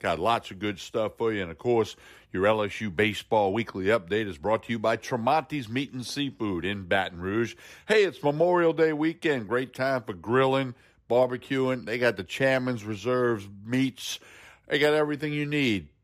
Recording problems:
none

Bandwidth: 14.5 kHz